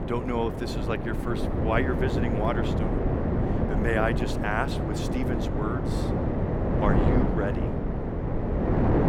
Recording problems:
wind noise on the microphone; heavy; 1 dB below the speech

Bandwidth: 17 kHz